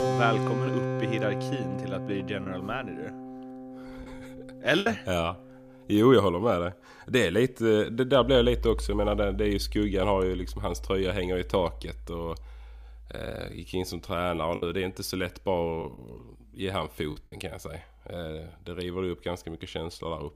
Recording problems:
background music; loud; throughout; 8 dB below the speech
choppy; very; from 2.5 to 5 s and from 15 to 17 s; 7% of the speech affected

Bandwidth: 15 kHz